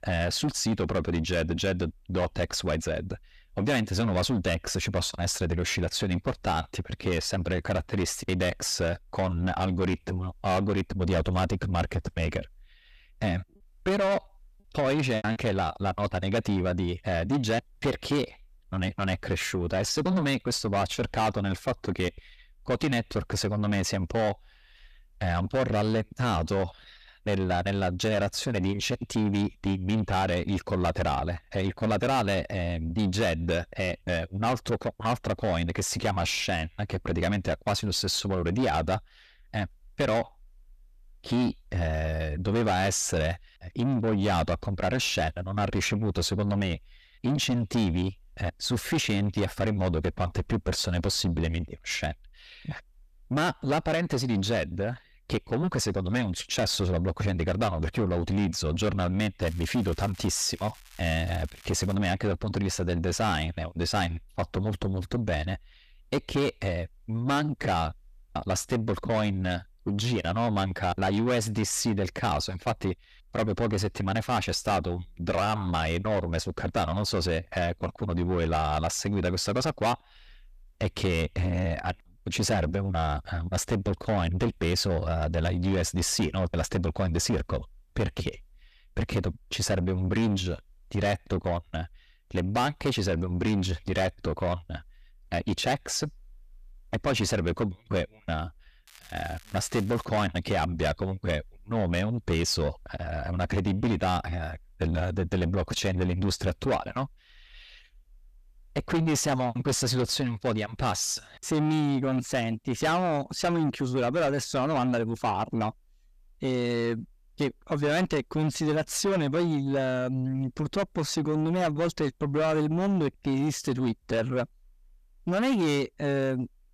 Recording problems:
distortion; heavy; 7 dB below the speech
crackling; faint; from 59 s to 1:02 and from 1:39 to 1:40; 20 dB below the speech
choppy; very; at 15 s; 6% of the speech affected

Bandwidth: 14.5 kHz